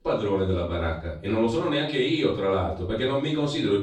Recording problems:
off-mic speech; far
room echo; noticeable; dies away in 0.4 s

